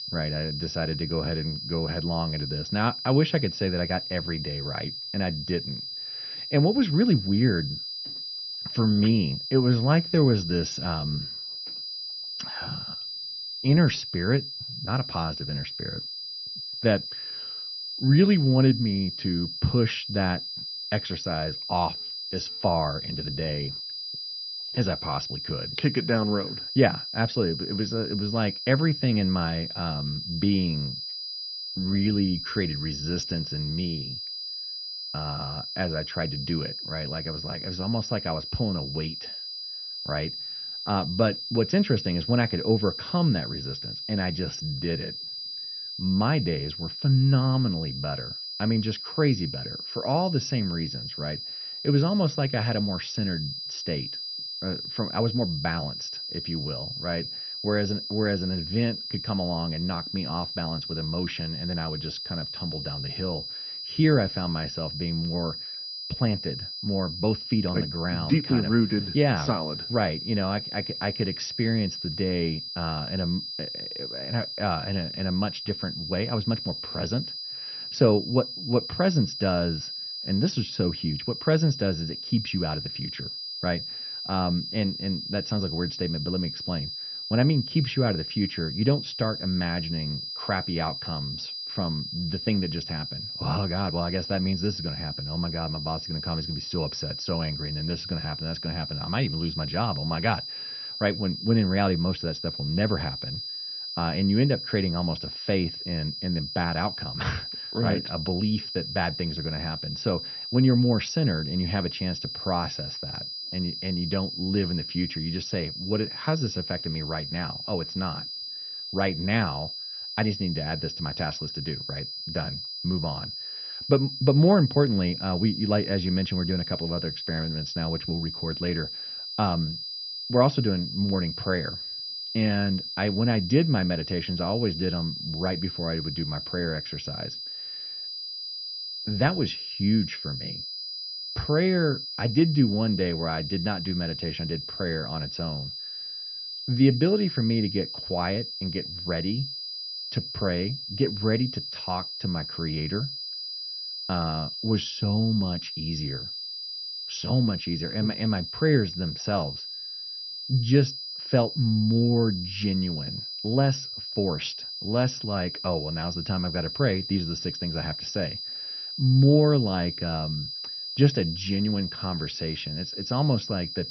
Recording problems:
garbled, watery; slightly; nothing above 6 kHz
high-pitched whine; loud; throughout; 5 kHz, 5 dB below the speech

